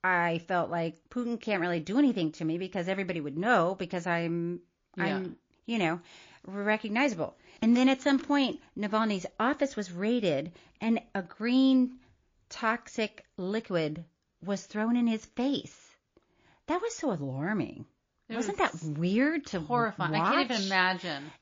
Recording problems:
garbled, watery; slightly

